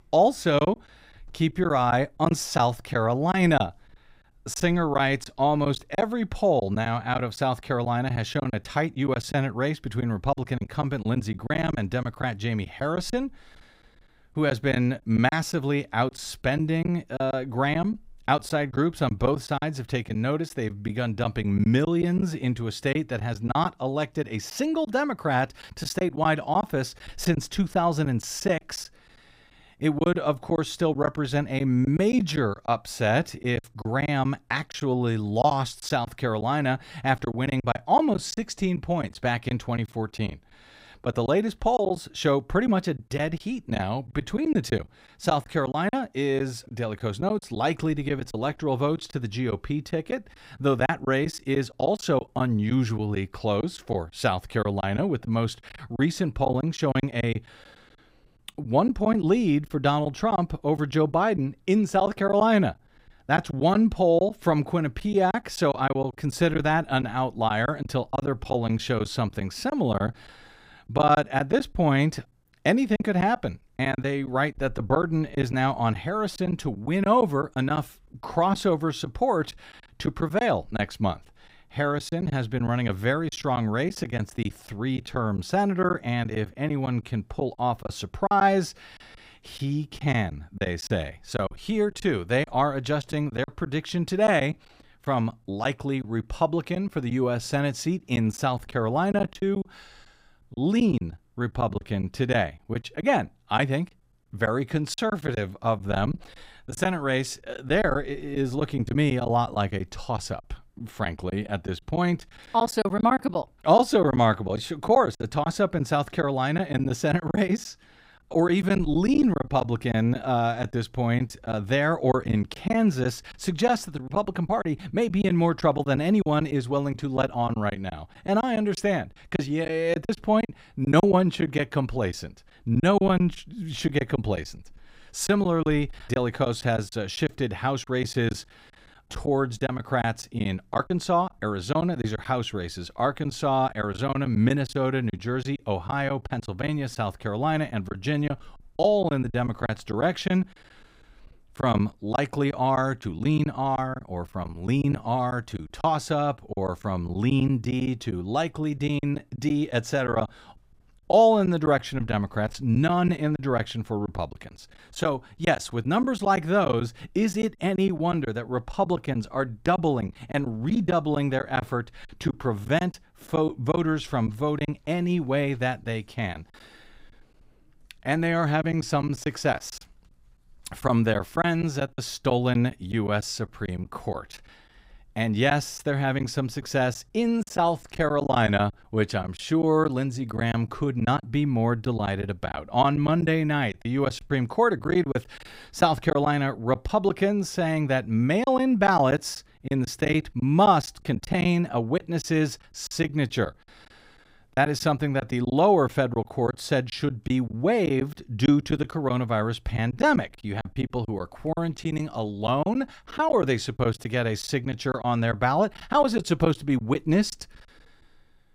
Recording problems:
choppy; very; 8% of the speech affected

